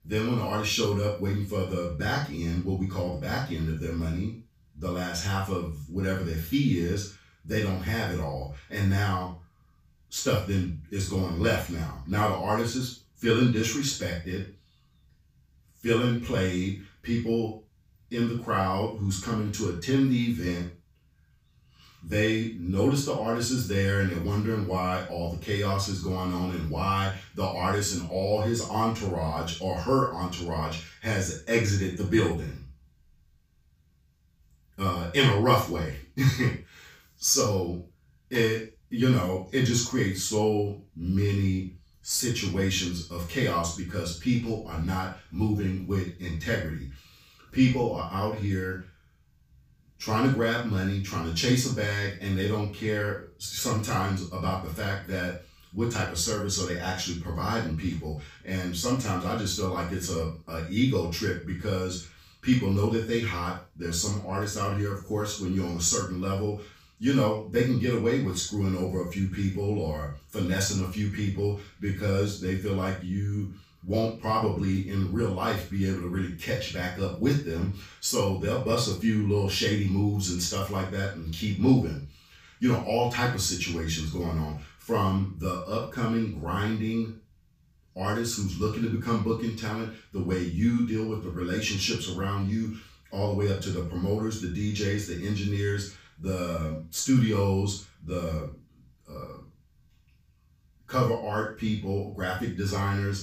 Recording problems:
off-mic speech; far
room echo; noticeable; dies away in 0.3 s

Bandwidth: 15 kHz